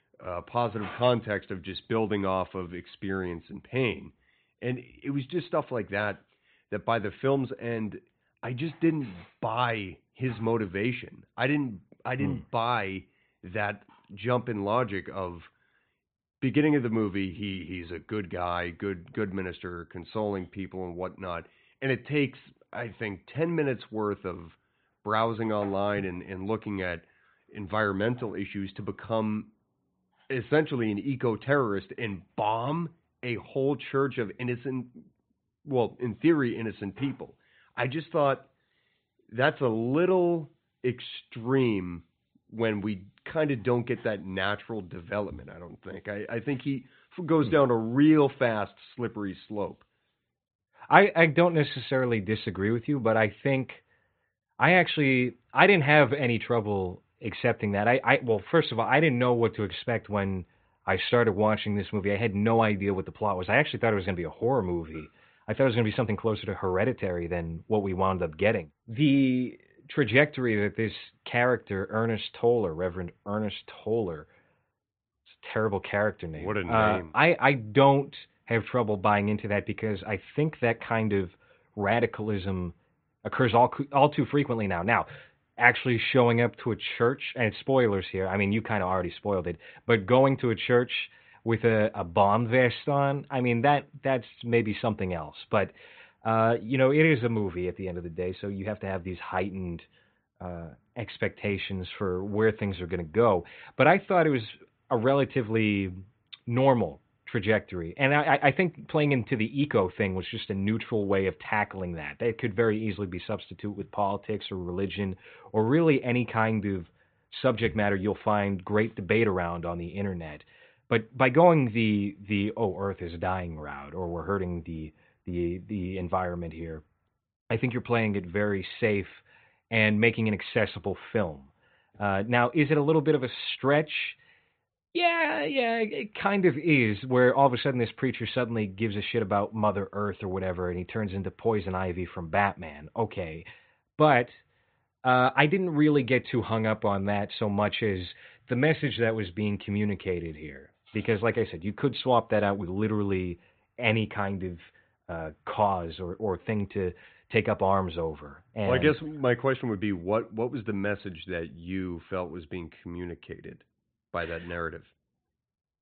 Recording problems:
high frequencies cut off; severe; nothing above 4 kHz

